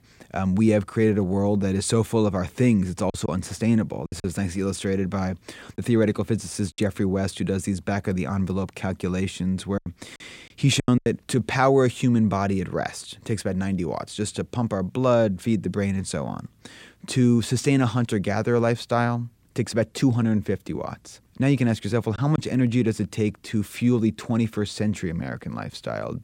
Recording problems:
choppy; very; from 3 to 7 s and from 10 to 11 s; 5% of the speech affected

